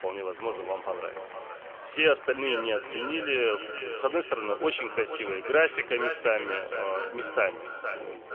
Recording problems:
echo of what is said; strong; throughout; 470 ms later, 8 dB below the speech
phone-call audio; nothing above 3 kHz
chatter from many people; noticeable; throughout; 15 dB below the speech

